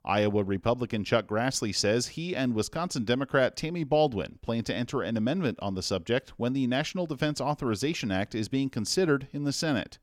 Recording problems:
none

